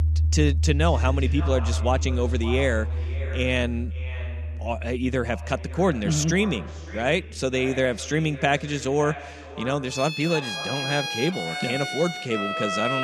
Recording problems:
echo of what is said; noticeable; throughout; 560 ms later, 15 dB below the speech
background music; loud; throughout; 3 dB below the speech
abrupt cut into speech; at the end

